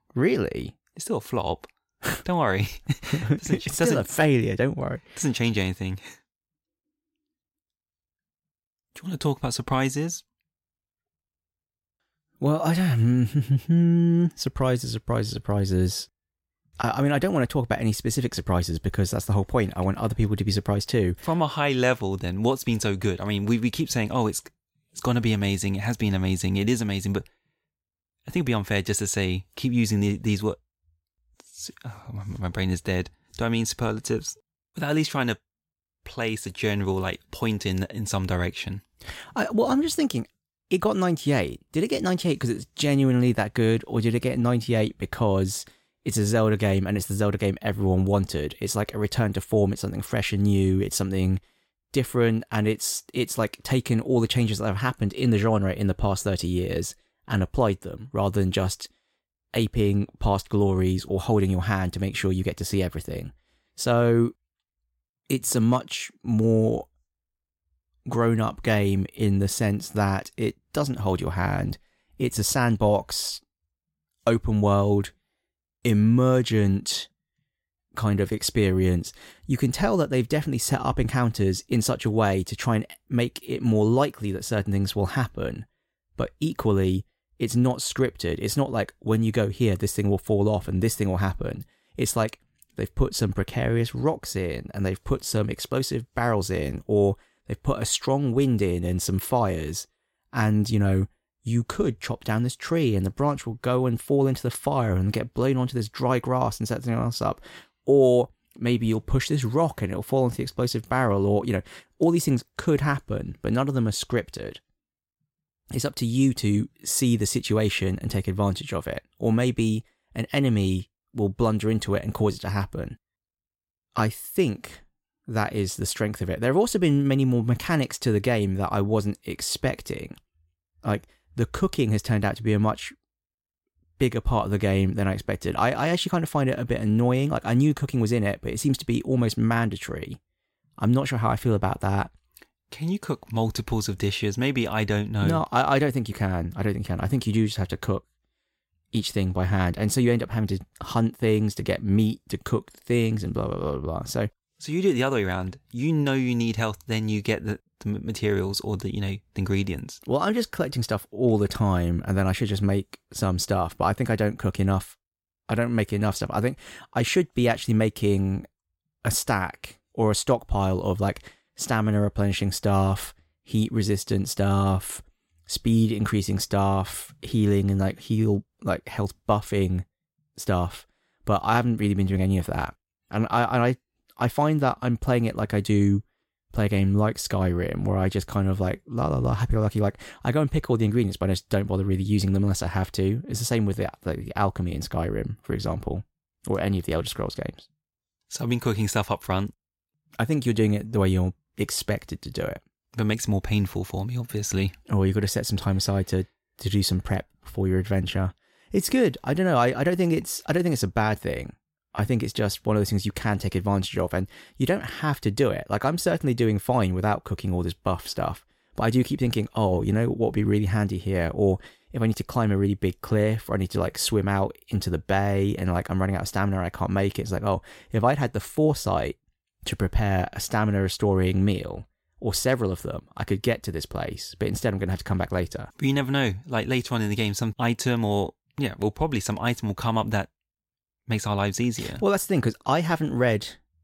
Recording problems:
none

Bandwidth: 16 kHz